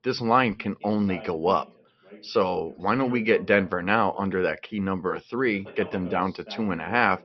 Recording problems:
high frequencies cut off; noticeable; nothing above 5.5 kHz
voice in the background; noticeable; throughout; 20 dB below the speech

